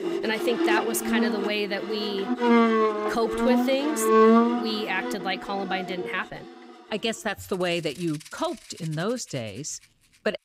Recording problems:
background music; very loud; throughout; 4 dB above the speech

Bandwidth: 15.5 kHz